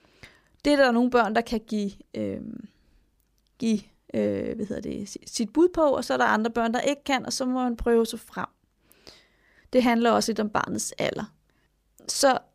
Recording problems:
none

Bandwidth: 15 kHz